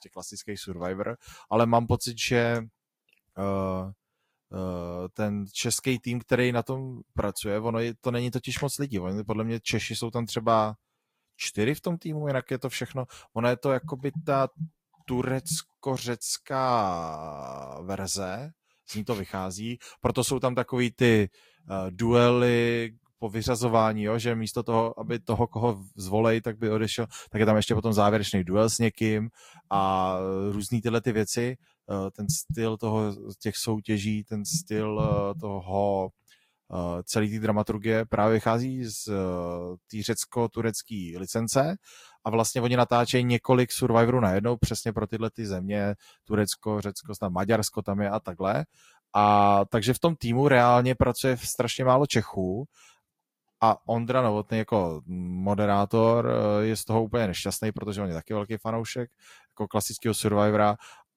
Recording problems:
garbled, watery; slightly; nothing above 15 kHz

